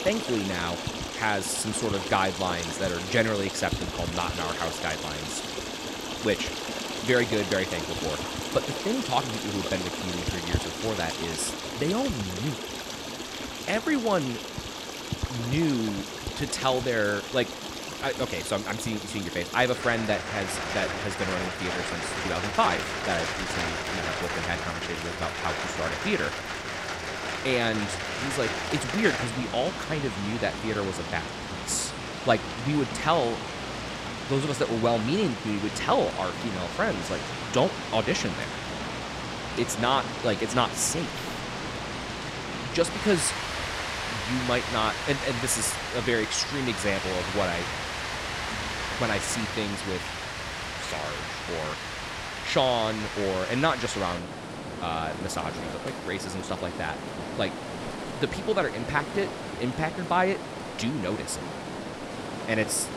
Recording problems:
rain or running water; loud; throughout; 3 dB below the speech

